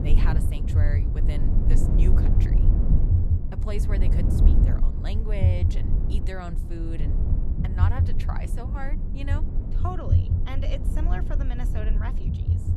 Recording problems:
low rumble; loud; throughout; 1 dB below the speech

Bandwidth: 14 kHz